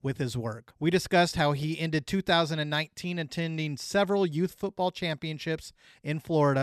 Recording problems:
abrupt cut into speech; at the end

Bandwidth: 13.5 kHz